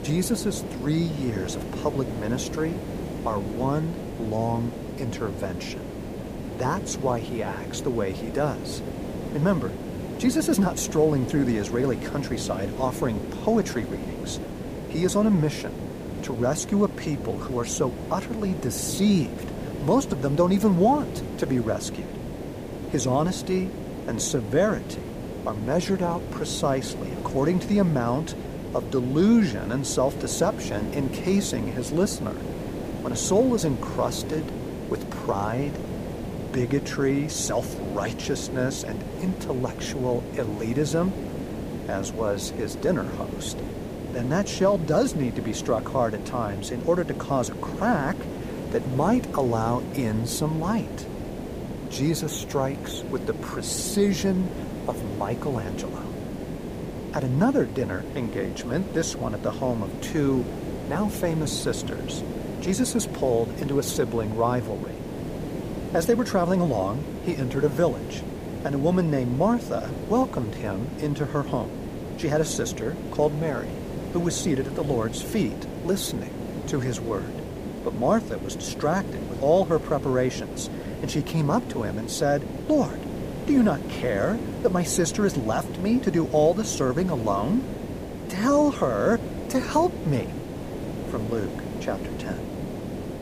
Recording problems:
hiss; loud; throughout; 7 dB below the speech

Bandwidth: 15 kHz